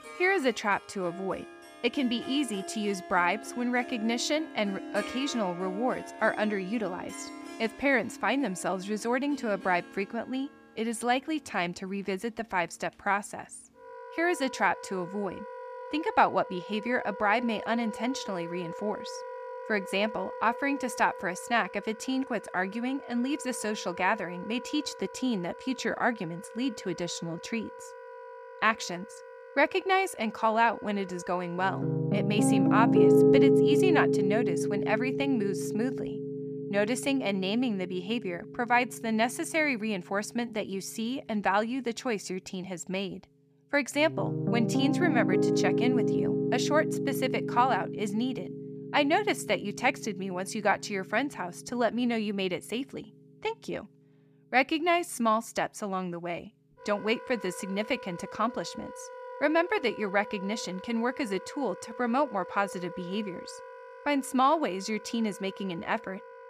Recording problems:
background music; loud; throughout; 3 dB below the speech

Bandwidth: 15 kHz